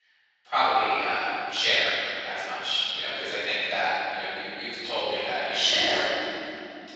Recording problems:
room echo; strong; dies away in 3 s
off-mic speech; far
thin; very; fading below 700 Hz
garbled, watery; slightly

